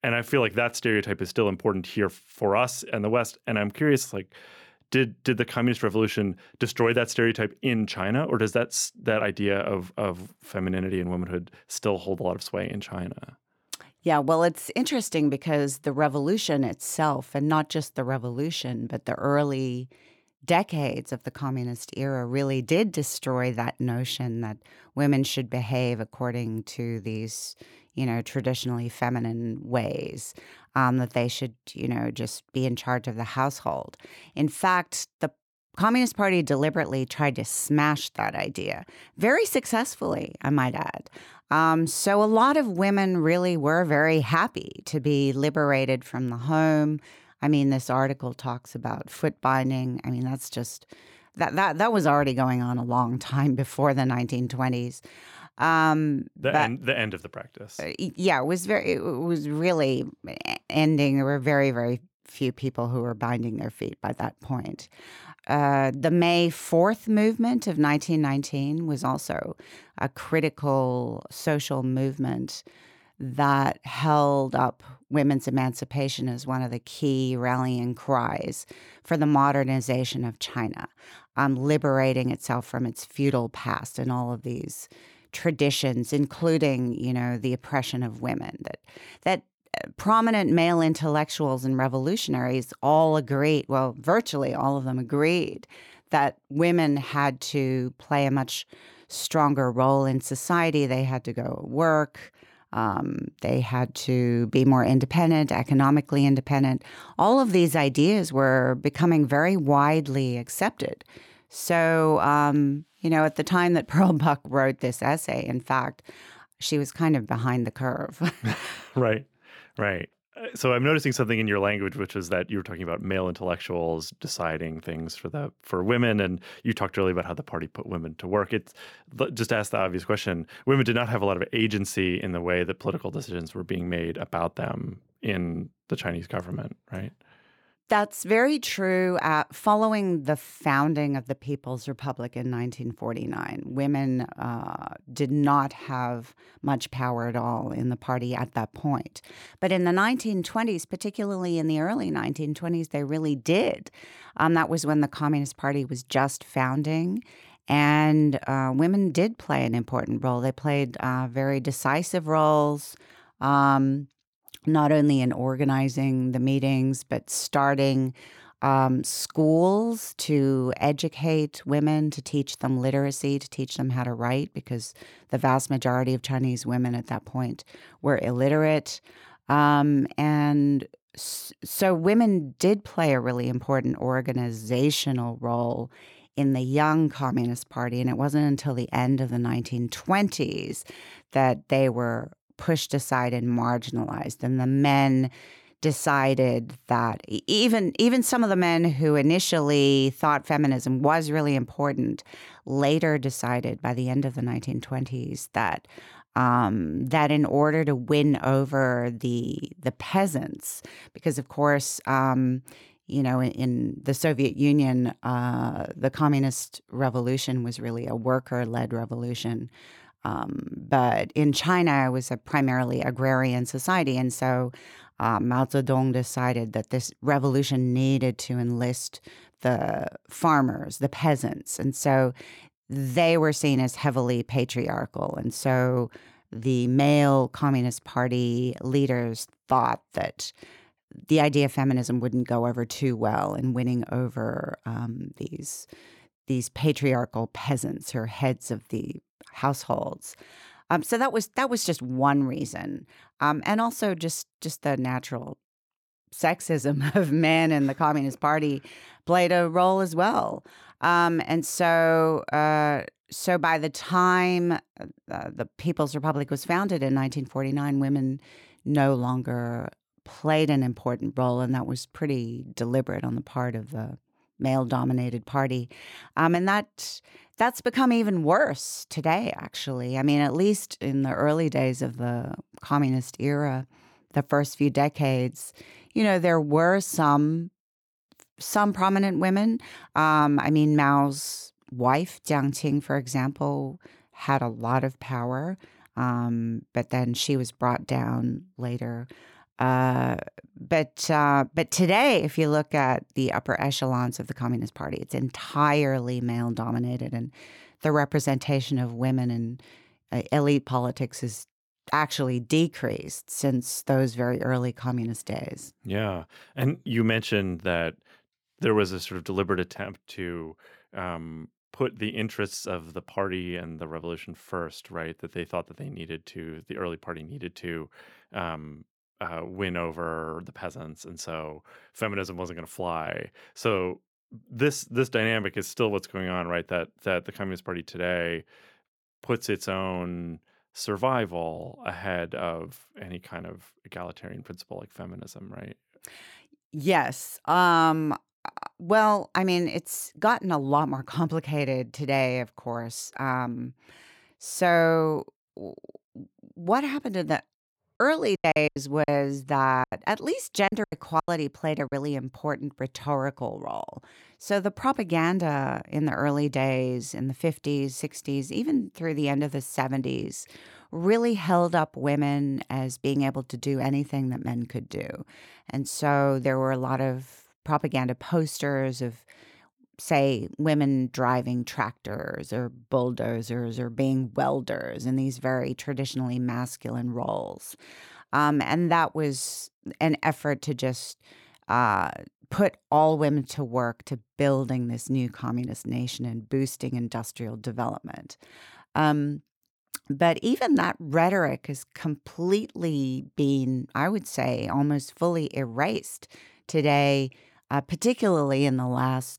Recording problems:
choppy; very; from 5:58 to 6:02; 16% of the speech affected

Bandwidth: 18.5 kHz